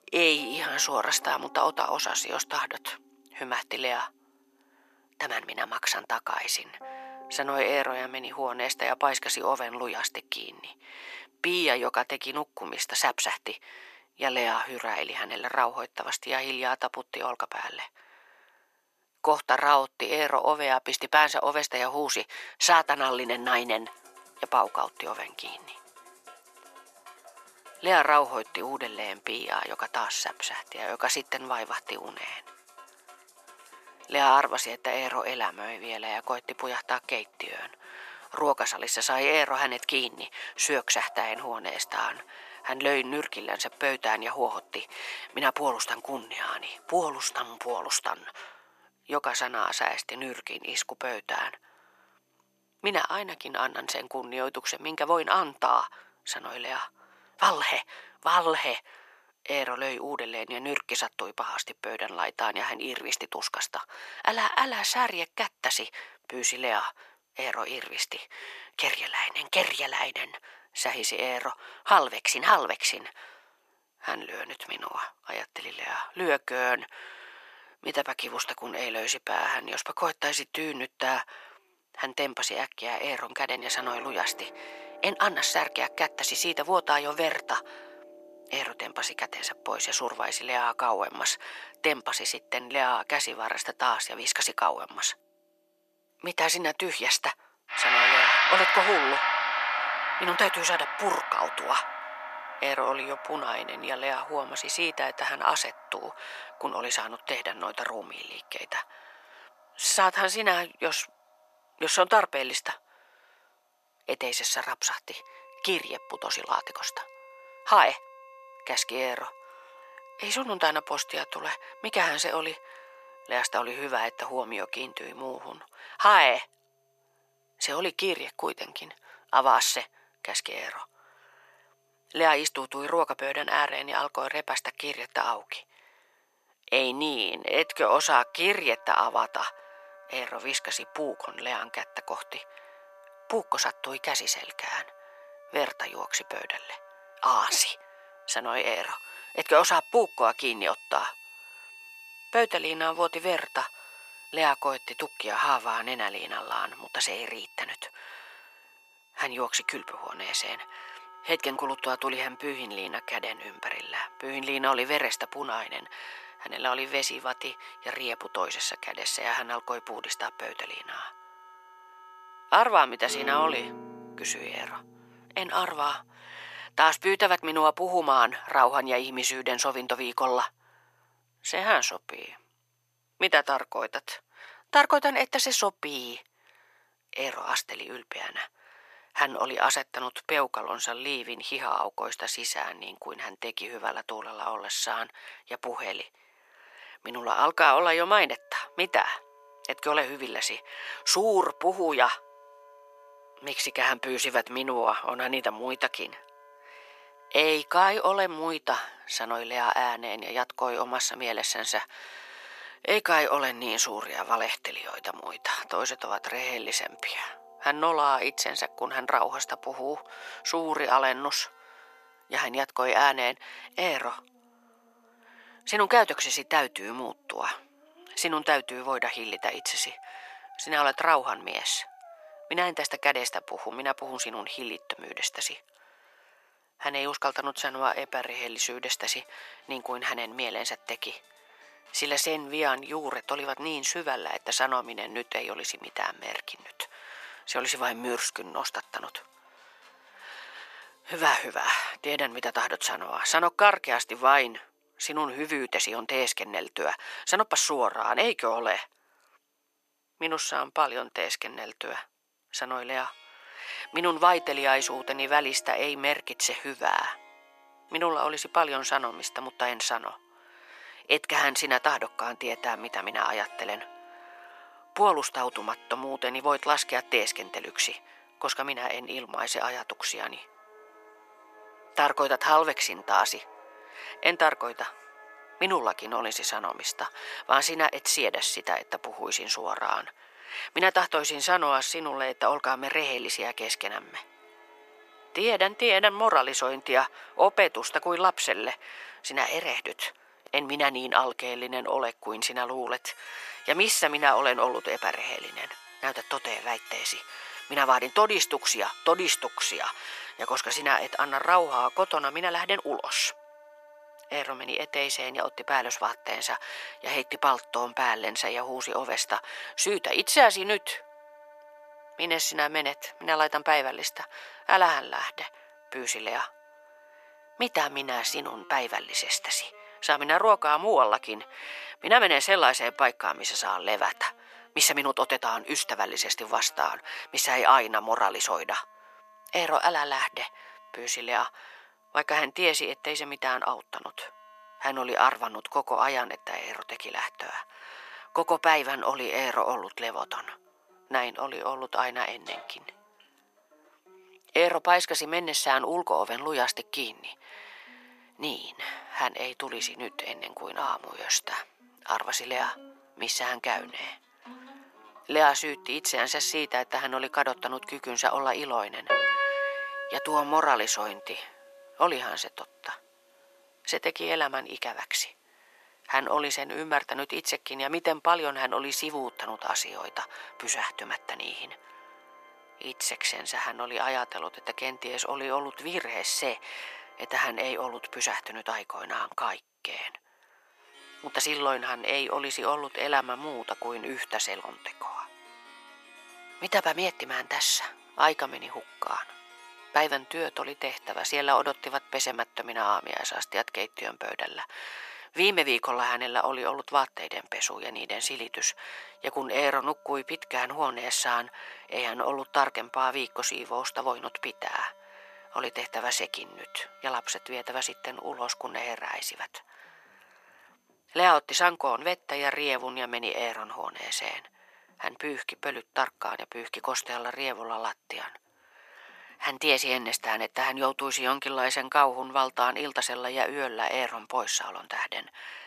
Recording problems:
thin; very; fading below 550 Hz
background music; noticeable; throughout; 10 dB below the speech

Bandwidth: 14 kHz